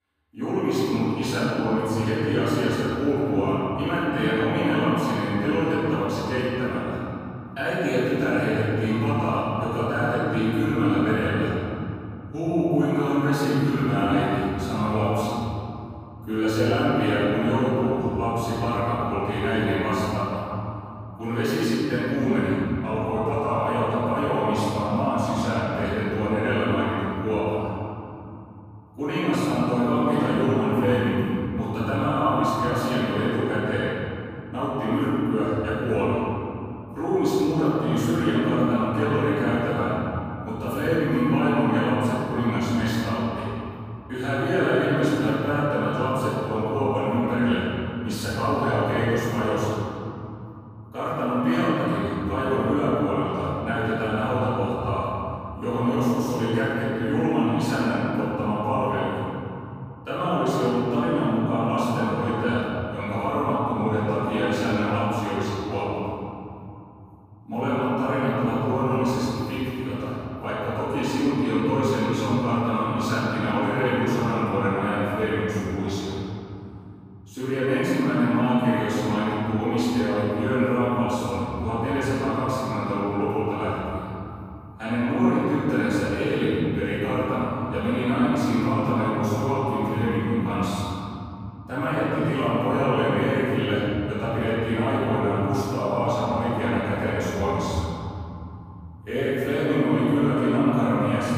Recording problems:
room echo; strong; dies away in 3 s
off-mic speech; far

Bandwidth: 15 kHz